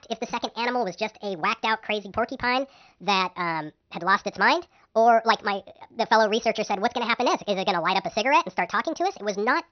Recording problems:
wrong speed and pitch; too fast and too high; 1.5 times normal speed
high frequencies cut off; noticeable; nothing above 6 kHz

